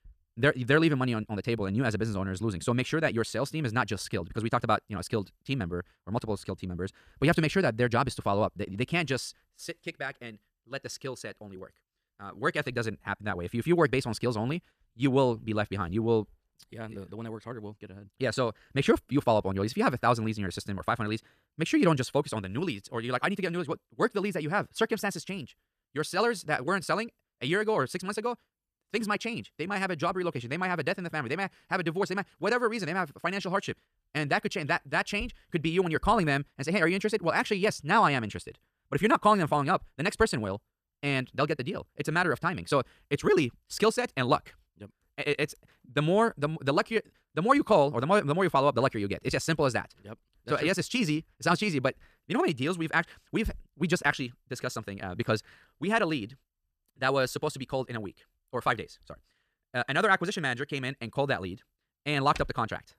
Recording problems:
wrong speed, natural pitch; too fast; 1.5 times normal speed

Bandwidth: 14.5 kHz